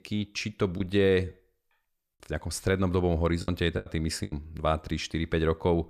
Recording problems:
choppy; very; at 3.5 s; 9% of the speech affected

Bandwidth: 14.5 kHz